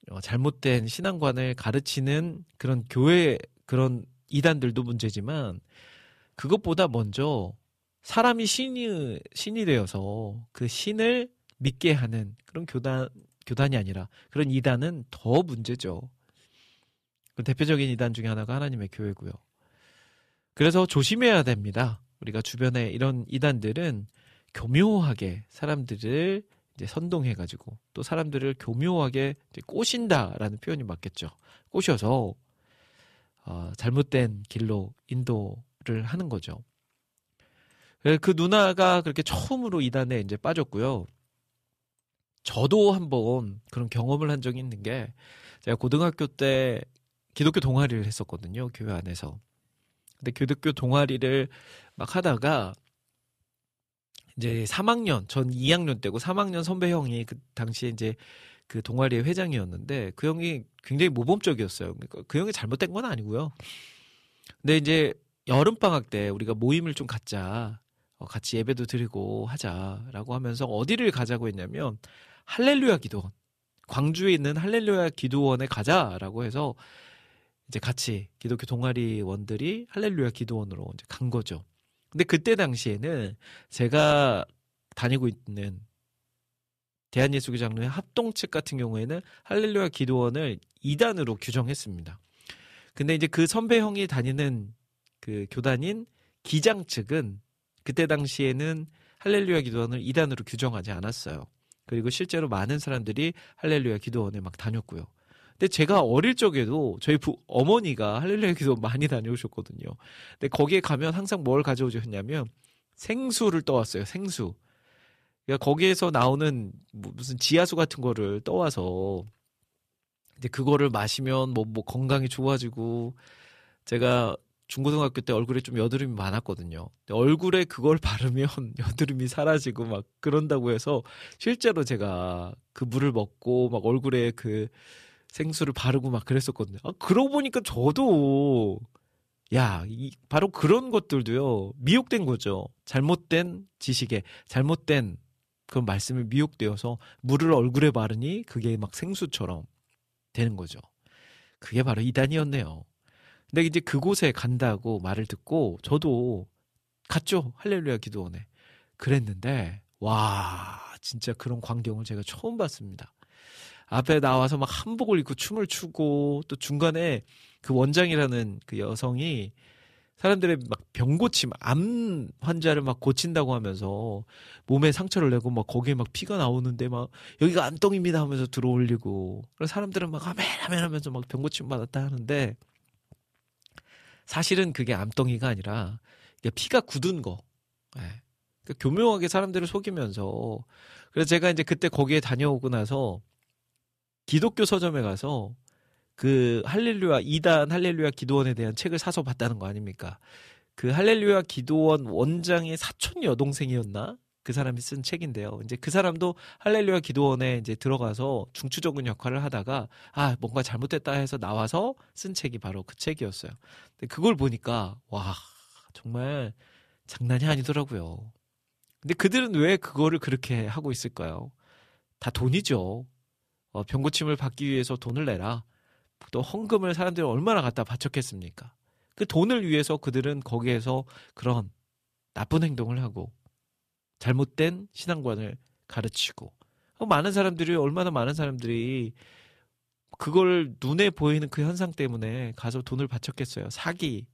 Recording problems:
none

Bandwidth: 14.5 kHz